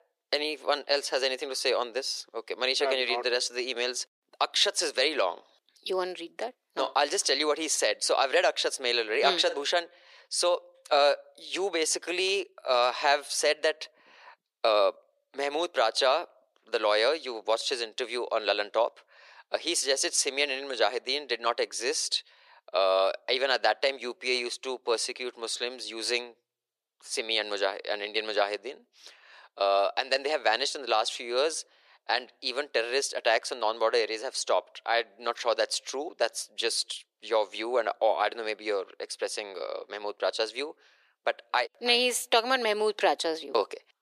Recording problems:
thin; very; fading below 400 Hz

